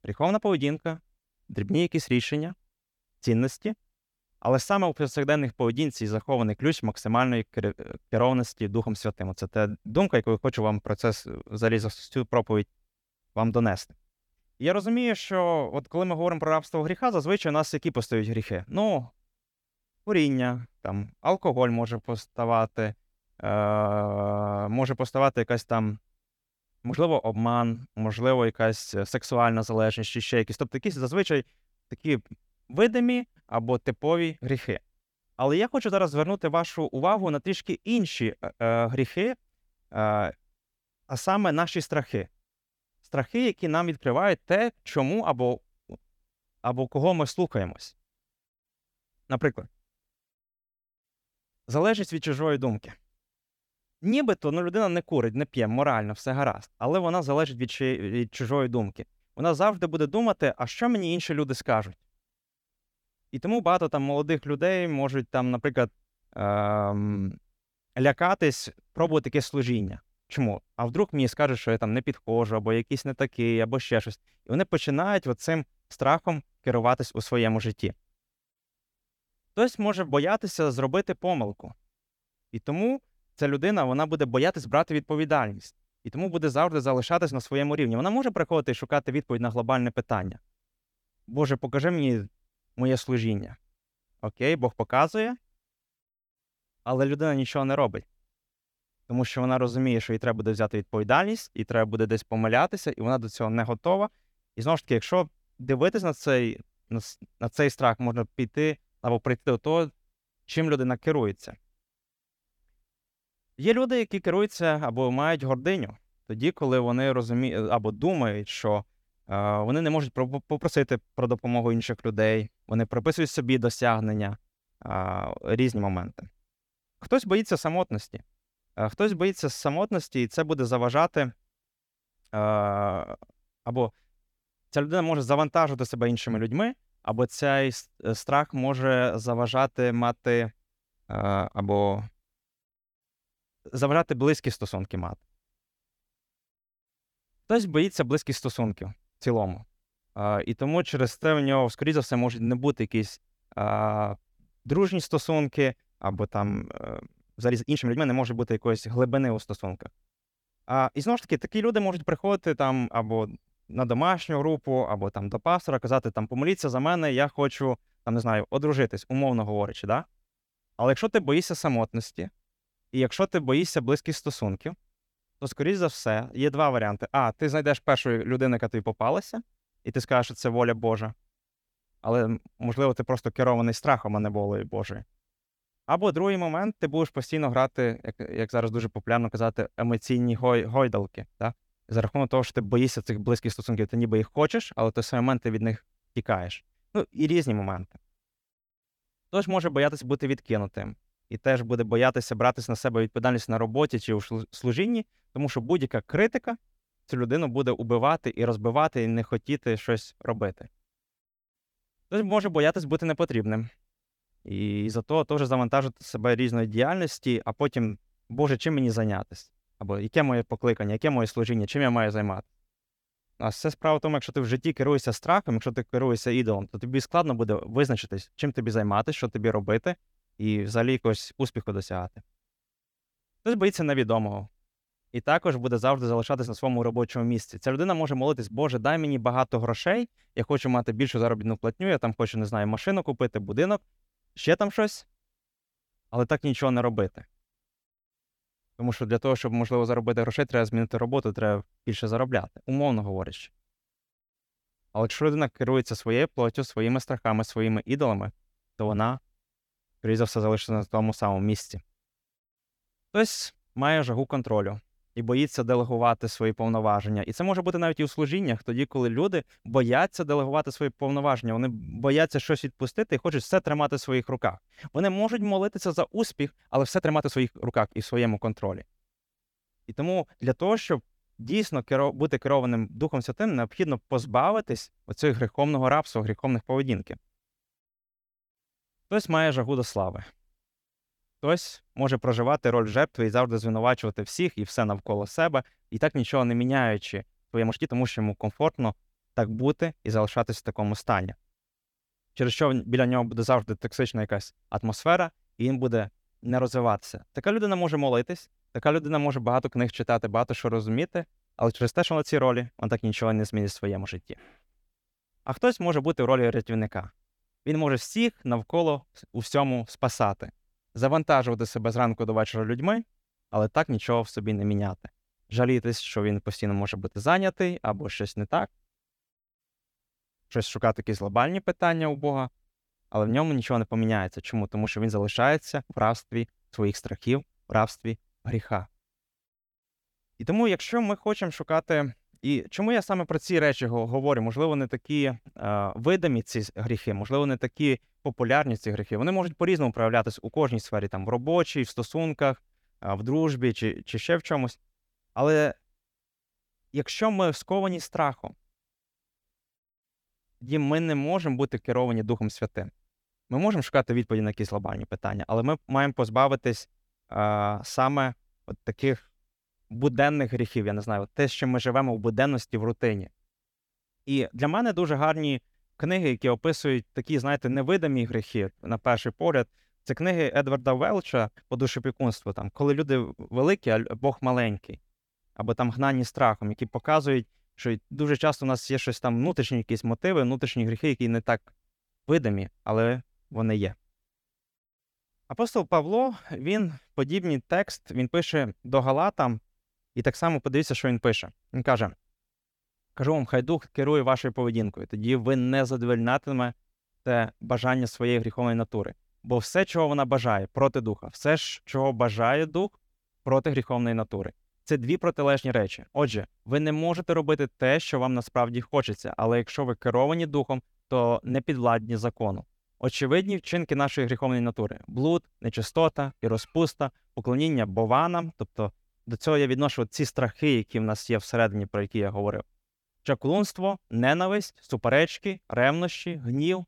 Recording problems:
uneven, jittery; strongly; from 22 s to 7:04

